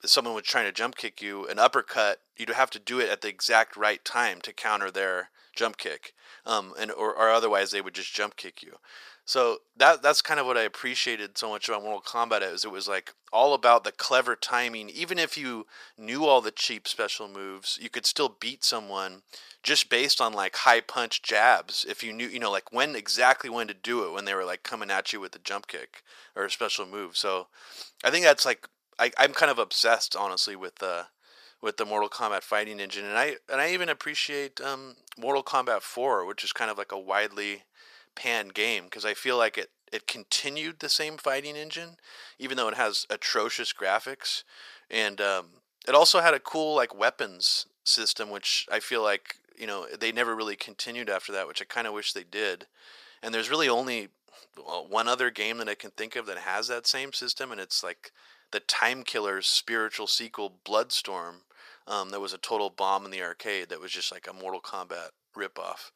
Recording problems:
thin; very; fading below 700 Hz

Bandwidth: 14.5 kHz